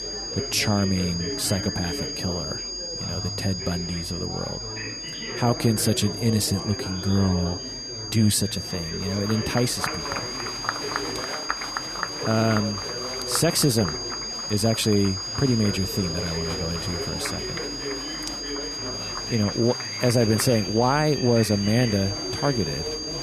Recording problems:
high-pitched whine; loud; throughout; 5 kHz, 6 dB below the speech
murmuring crowd; loud; throughout; 9 dB below the speech

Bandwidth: 14 kHz